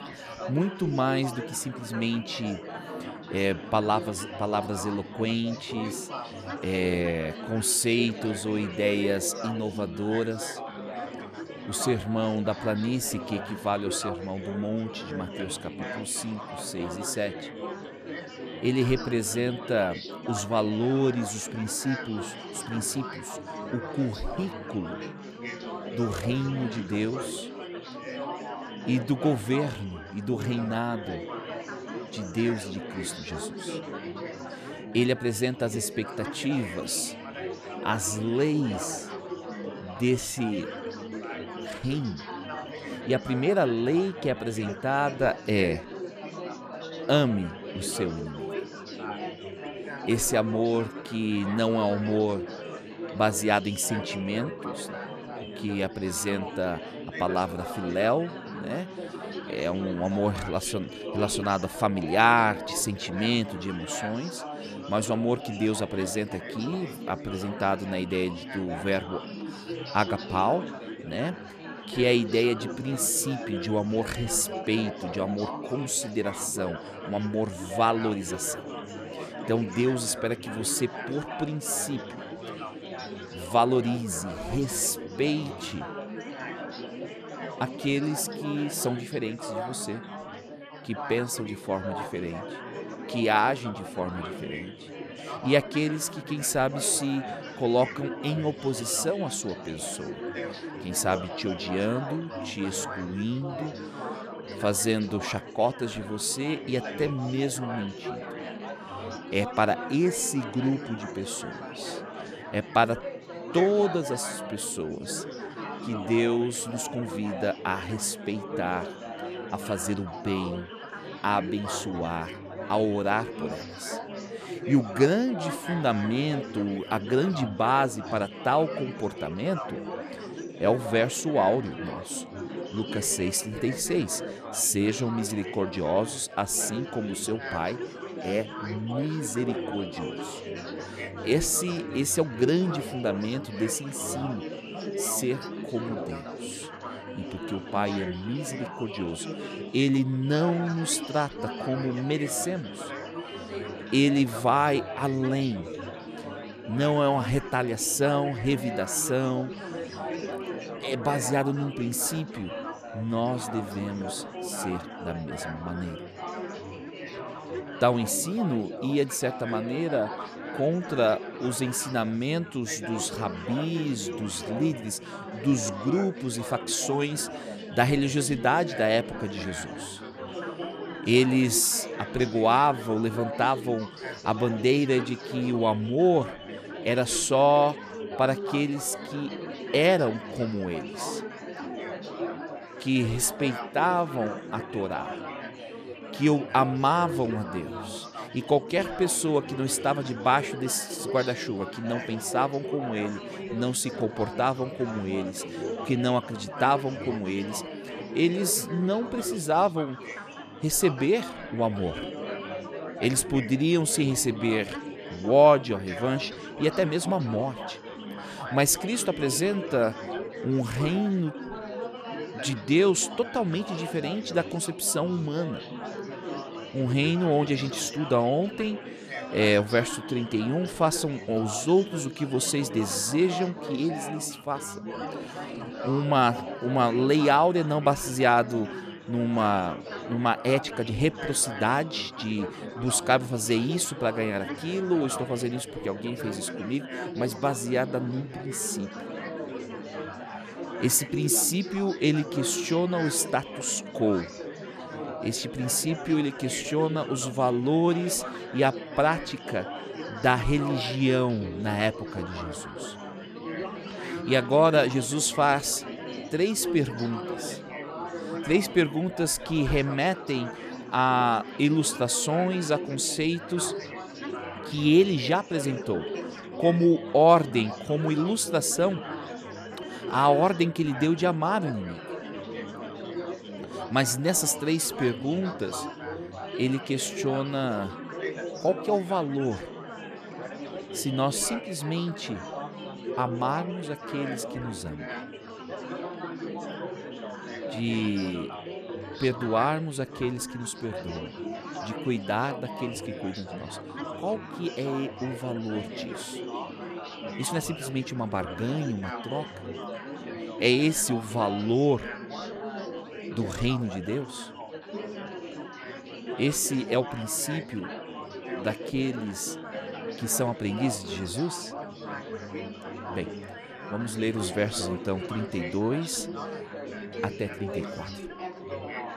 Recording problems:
chatter from many people; loud; throughout; 10 dB below the speech

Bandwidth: 14 kHz